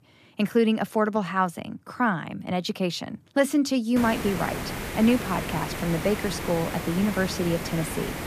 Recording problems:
hiss; loud; from 4 s on; 7 dB below the speech

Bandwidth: 14.5 kHz